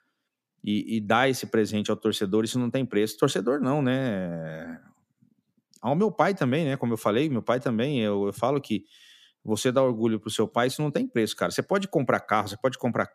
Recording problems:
none

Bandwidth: 14.5 kHz